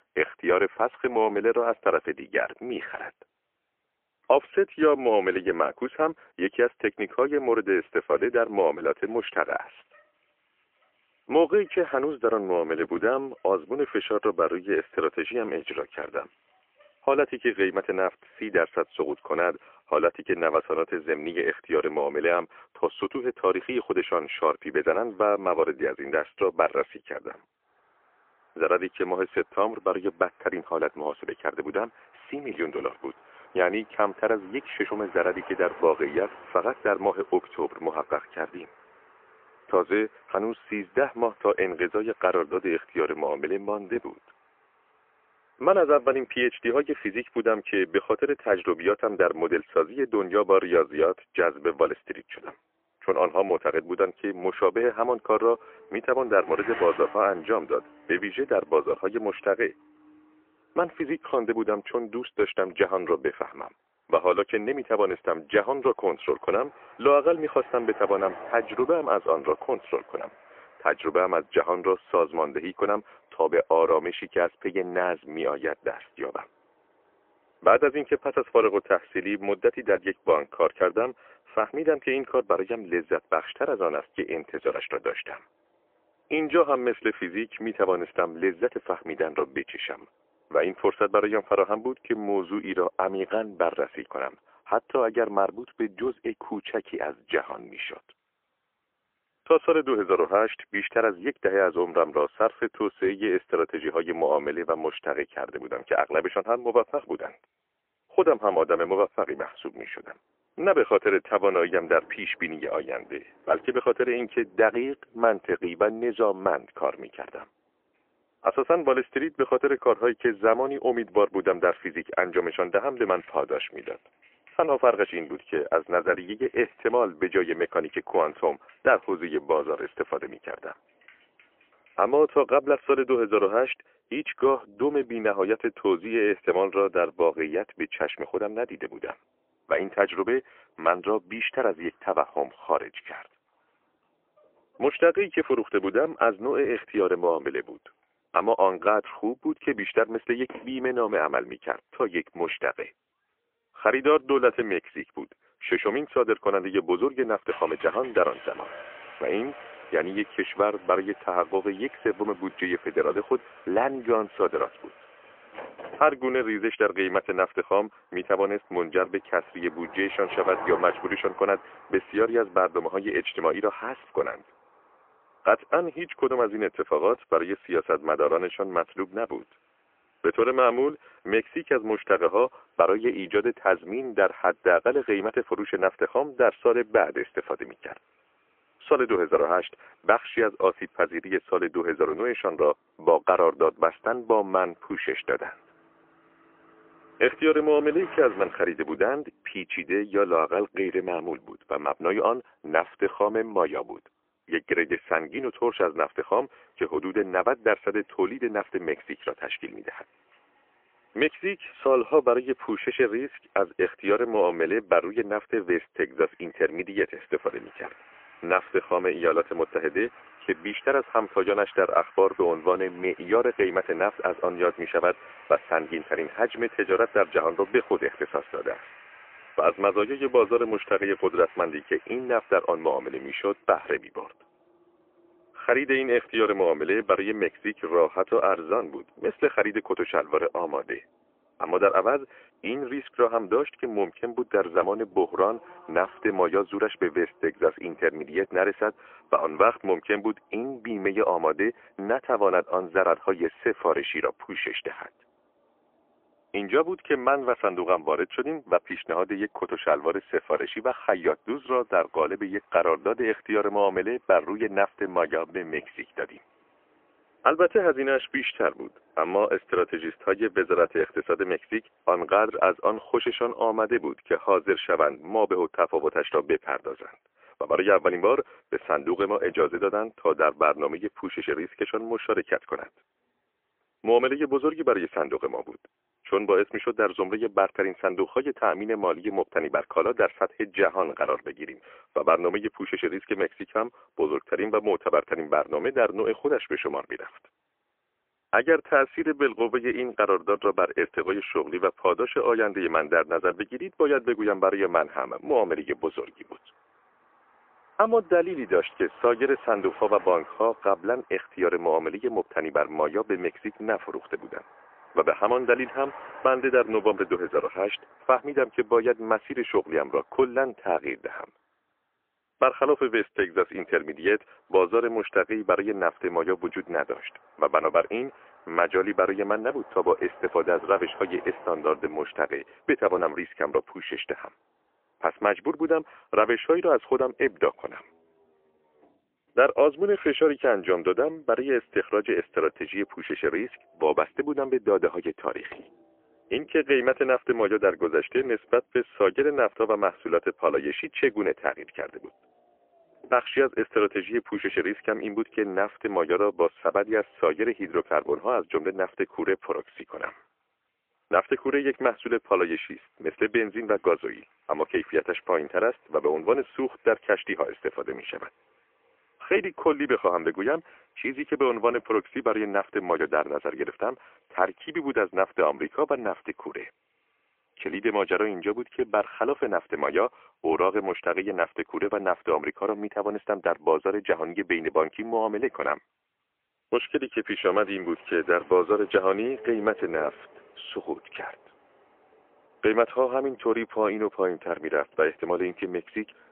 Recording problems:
phone-call audio; poor line; nothing above 3 kHz
traffic noise; faint; throughout; 25 dB below the speech

